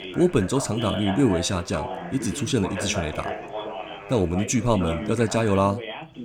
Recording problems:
background chatter; loud; throughout; 2 voices, 9 dB below the speech

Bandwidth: 17.5 kHz